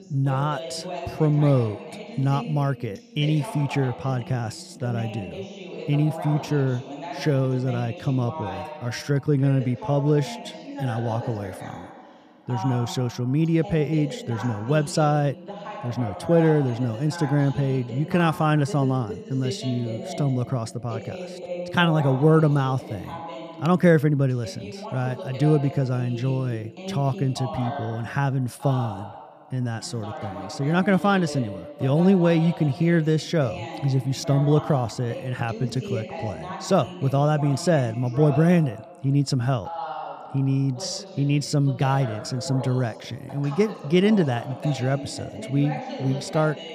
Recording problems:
voice in the background; noticeable; throughout; 10 dB below the speech

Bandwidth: 15 kHz